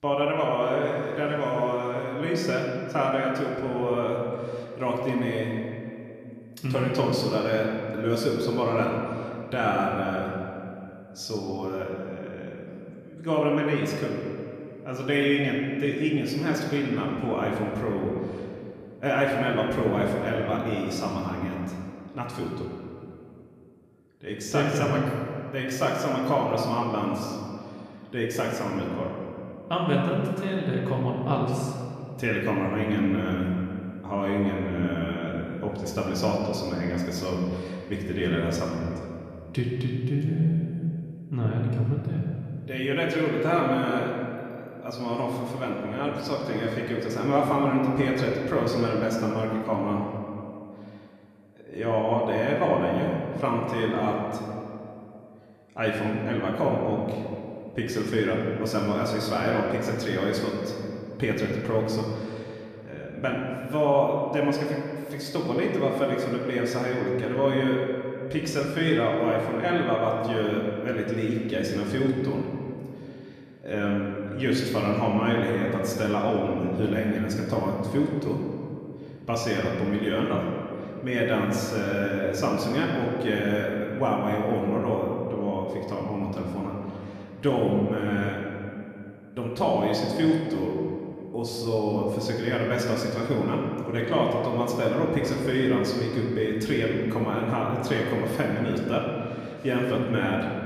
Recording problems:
room echo; noticeable; dies away in 2.3 s
off-mic speech; somewhat distant

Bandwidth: 14.5 kHz